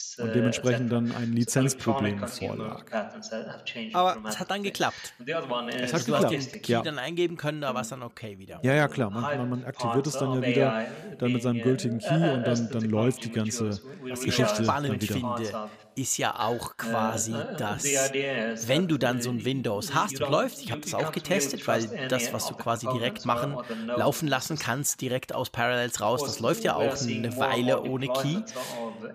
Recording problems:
voice in the background; loud; throughout; 5 dB below the speech
uneven, jittery; slightly; from 4 to 20 s

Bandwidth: 15 kHz